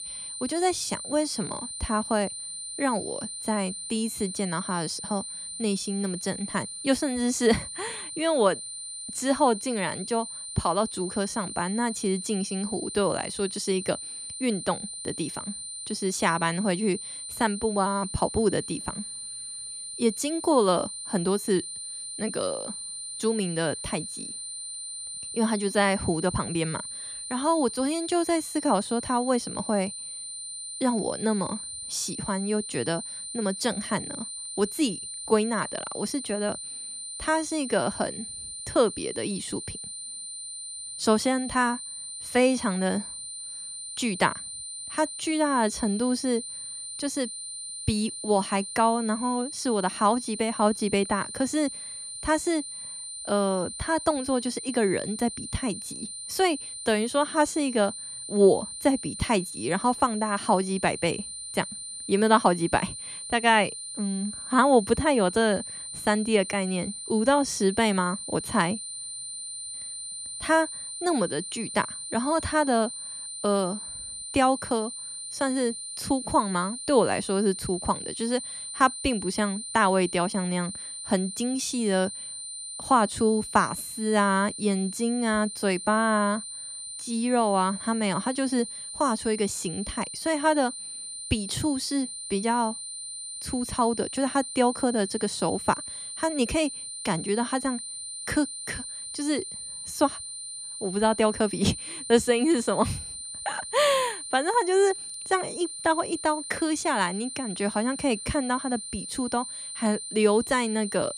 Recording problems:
high-pitched whine; loud; throughout; 9 kHz, 8 dB below the speech

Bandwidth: 14 kHz